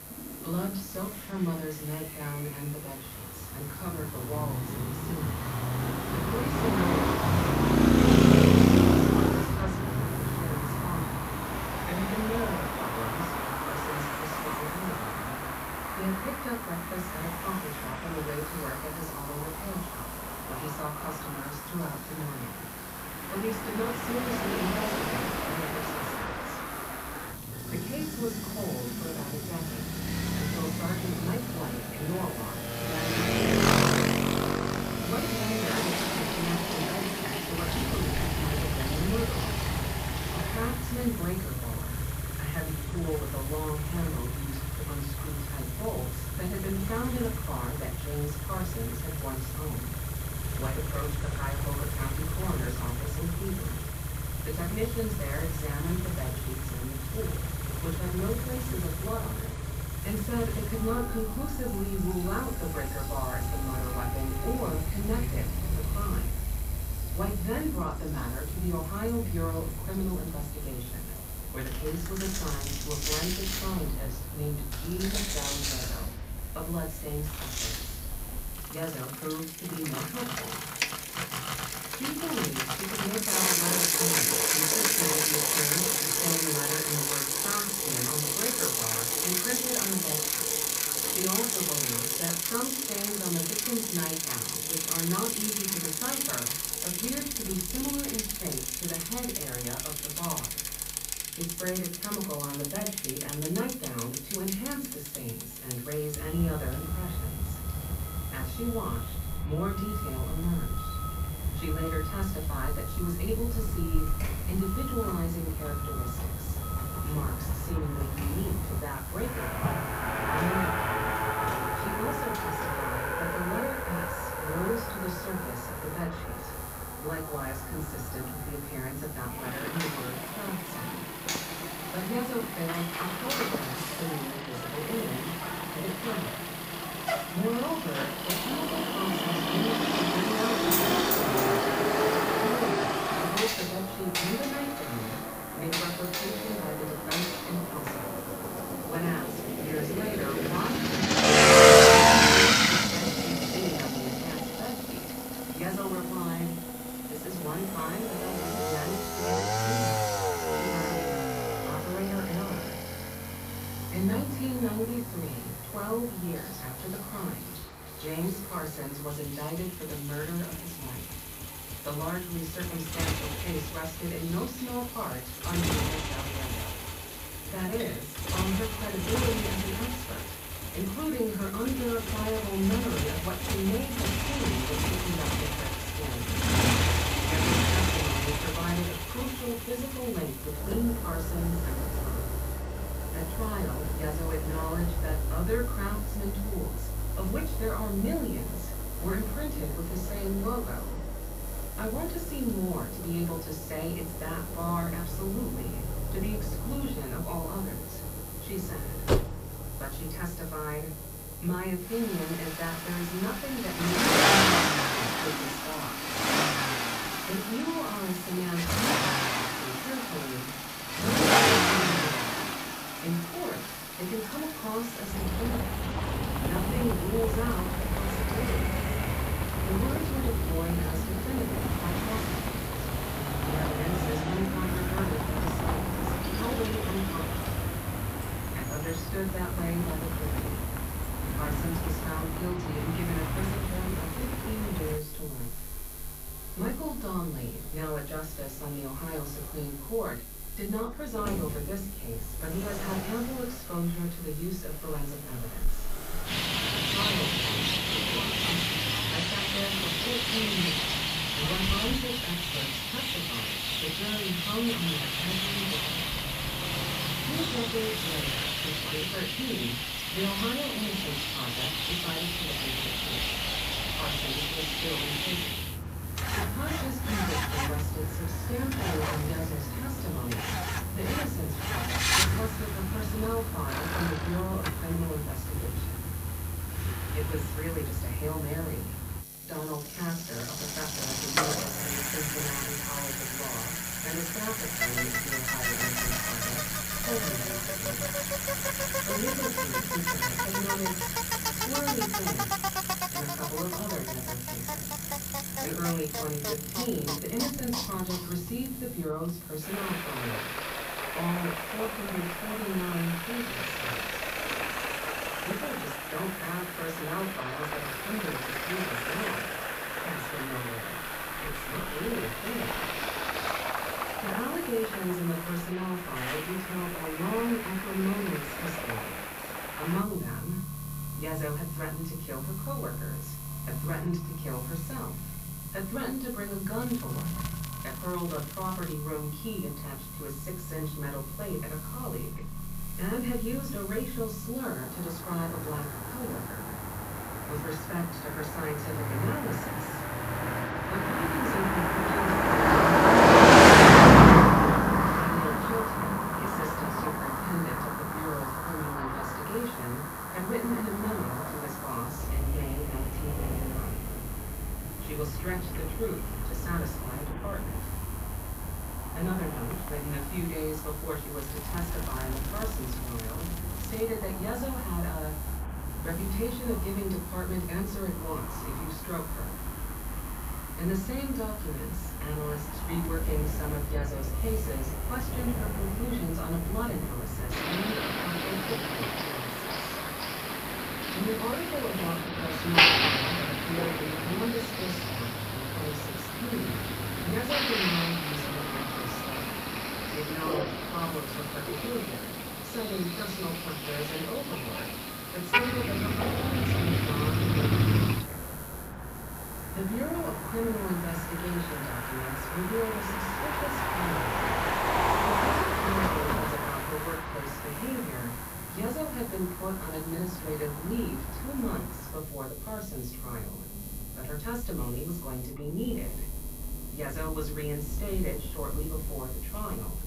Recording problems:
off-mic speech; far
room echo; slight; dies away in 0.3 s
traffic noise; very loud; throughout; 7 dB above the speech
electrical hum; loud; throughout; 50 Hz, 10 dB below the speech
household noises; loud; throughout; 5 dB below the speech
crackling; noticeable; from 5:37 to 5:39, from 6:11 to 6:14 and at 6:14; 10 dB below the speech

